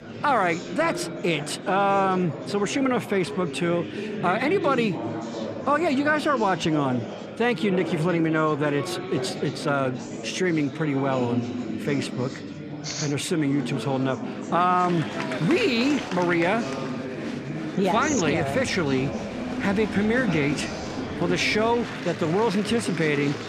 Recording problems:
murmuring crowd; loud; throughout; 7 dB below the speech

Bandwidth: 14 kHz